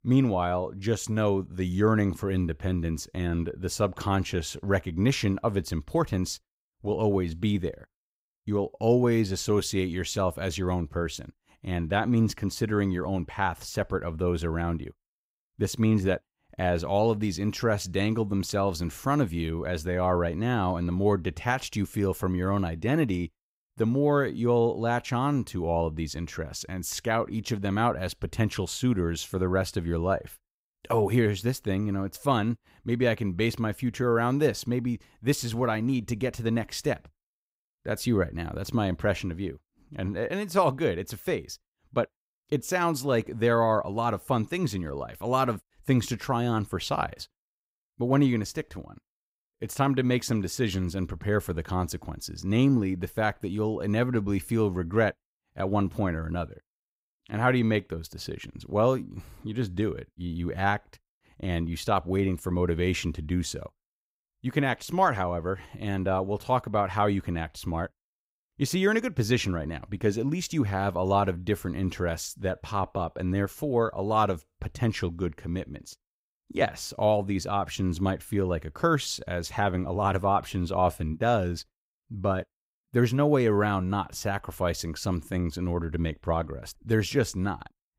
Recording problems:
none

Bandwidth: 15.5 kHz